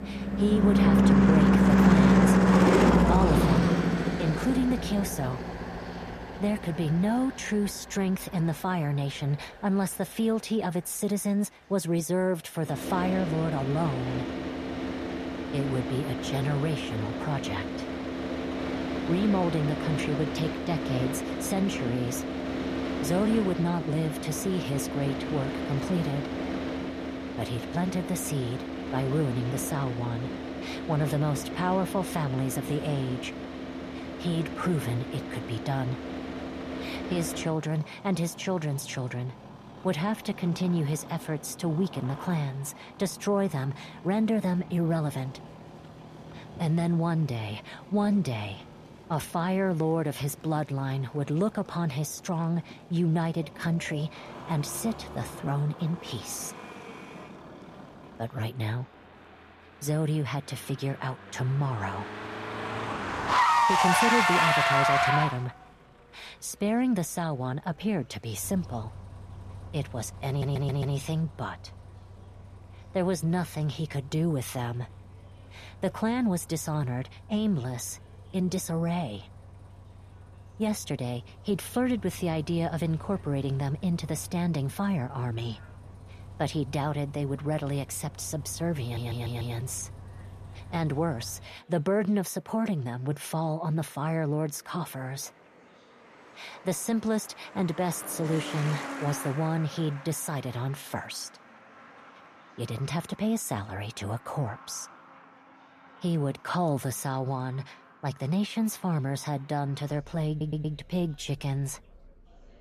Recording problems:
traffic noise; very loud; throughout; 2 dB above the speech
chatter from many people; faint; throughout; 30 dB below the speech
audio stuttering; at 1:10, at 1:29 and at 1:50

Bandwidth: 14.5 kHz